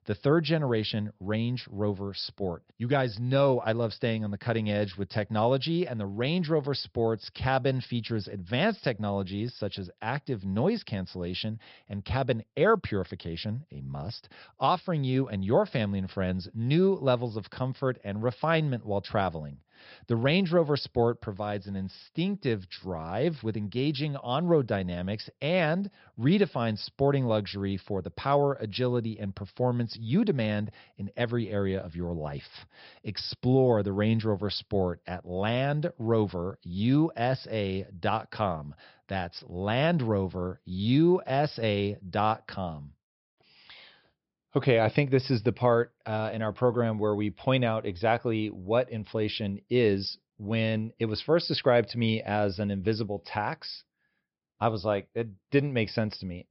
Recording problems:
high frequencies cut off; noticeable; nothing above 5.5 kHz

